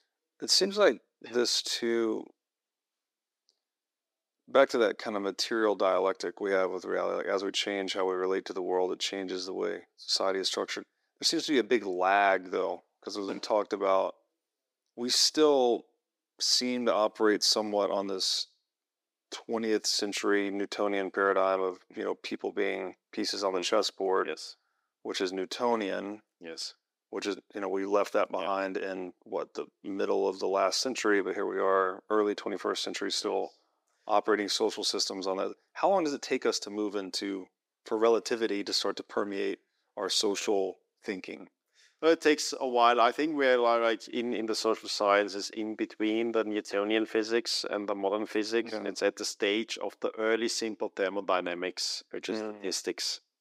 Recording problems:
thin; somewhat; fading below 300 Hz

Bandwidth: 15.5 kHz